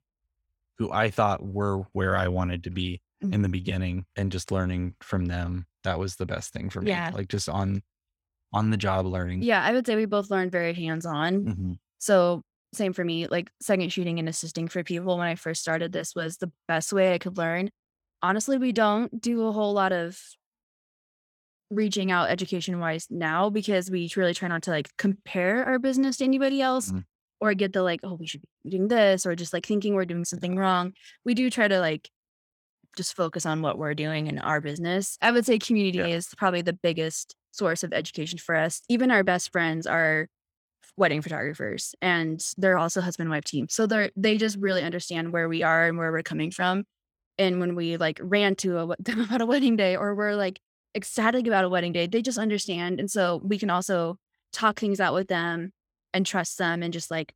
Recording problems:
none

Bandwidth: 18.5 kHz